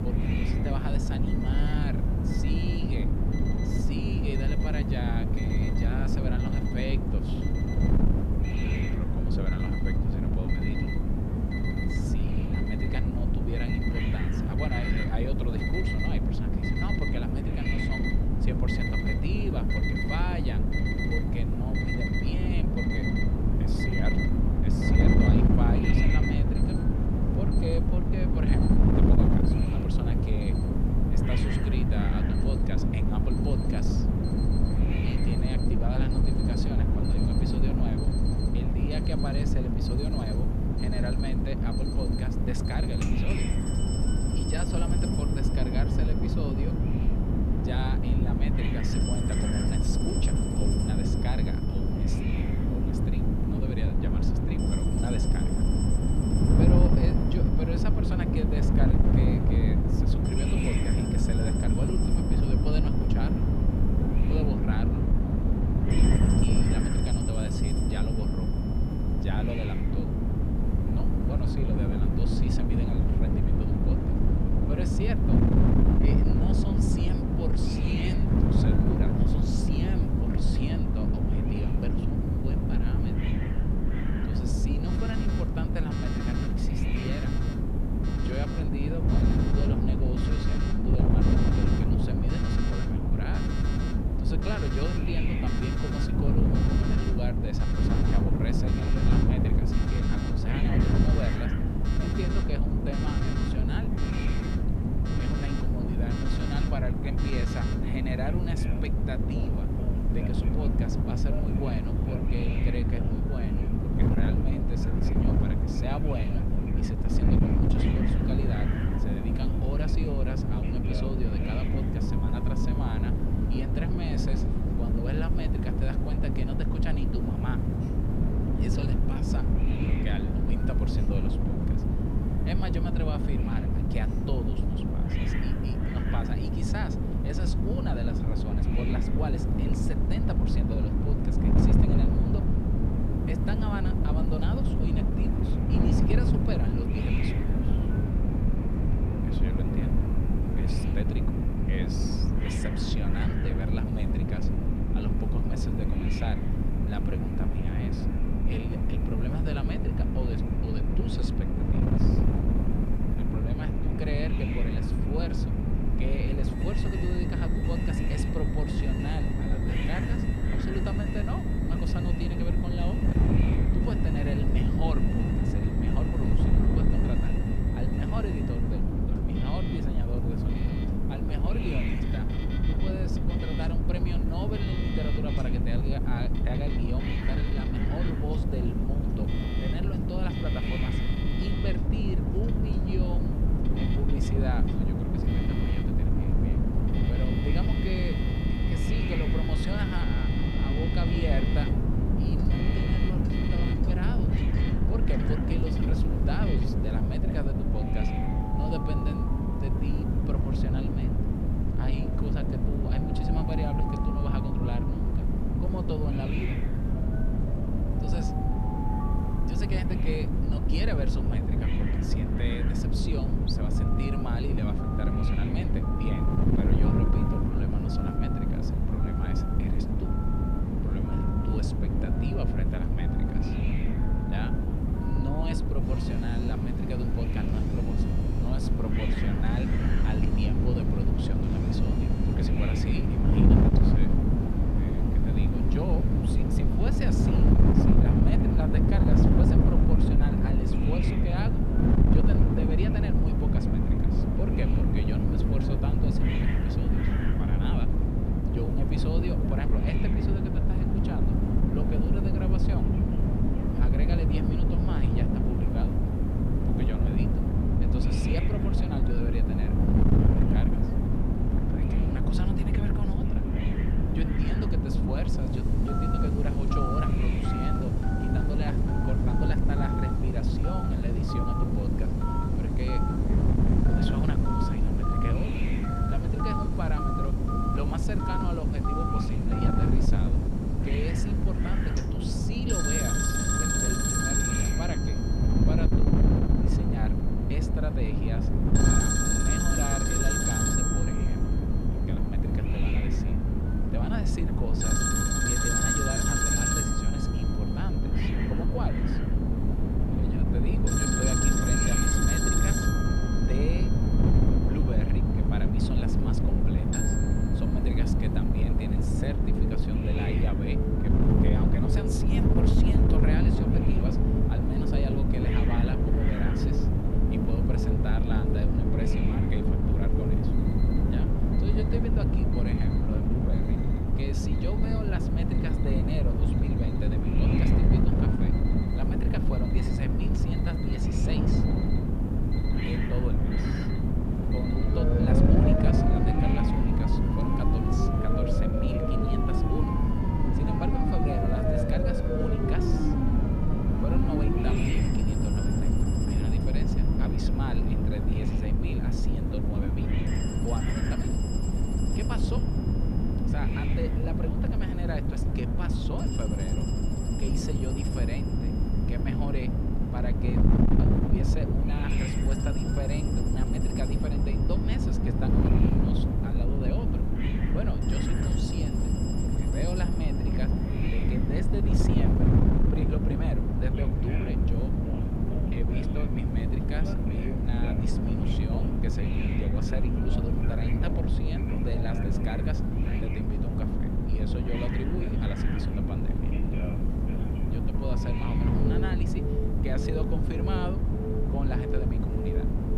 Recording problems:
alarms or sirens; very loud; throughout; 1 dB above the speech
wind noise on the microphone; heavy; 4 dB above the speech
electrical hum; noticeable; throughout; 60 Hz, 15 dB below the speech
hiss; noticeable; throughout; 10 dB below the speech

